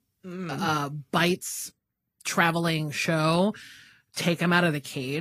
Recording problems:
garbled, watery; slightly; nothing above 15.5 kHz
abrupt cut into speech; at the end

